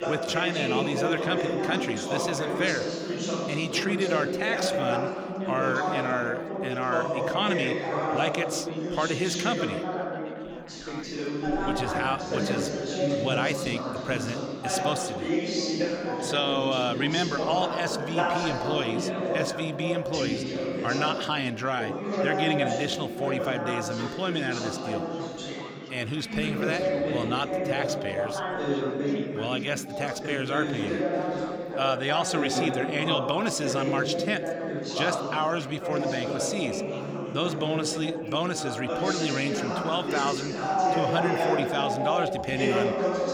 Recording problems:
chatter from many people; very loud; throughout; as loud as the speech

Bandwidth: 18.5 kHz